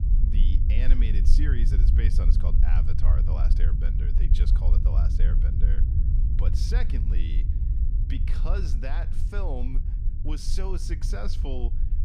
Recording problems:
low rumble; loud; throughout; 4 dB below the speech

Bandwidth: 15.5 kHz